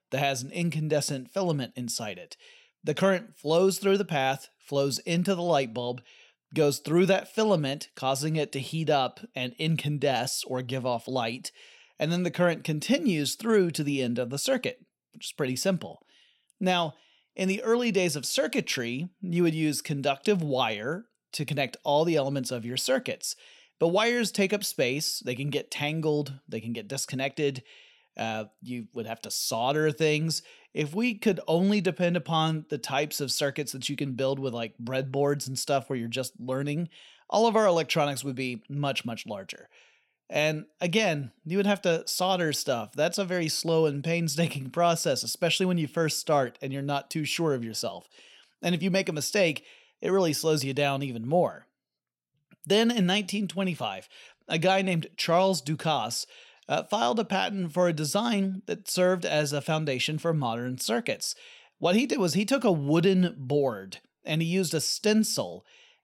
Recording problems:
none

